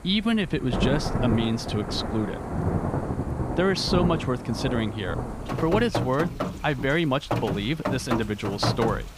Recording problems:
rain or running water; loud; throughout; 3 dB below the speech

